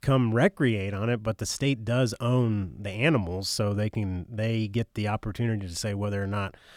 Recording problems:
none

